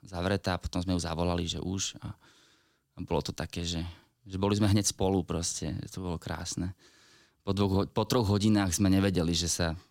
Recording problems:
none

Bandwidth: 16.5 kHz